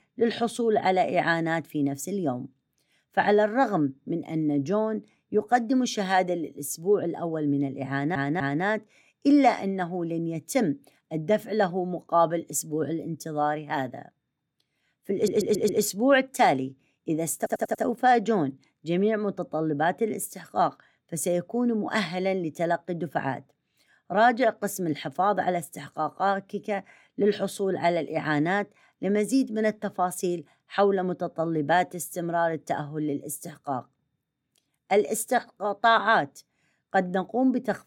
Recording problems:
audio stuttering; at 8 s, at 15 s and at 17 s

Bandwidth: 17.5 kHz